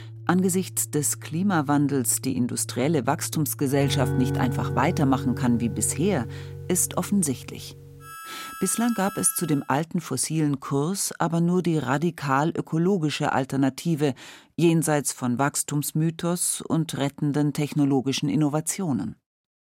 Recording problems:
background music; loud; until 9.5 s; 10 dB below the speech

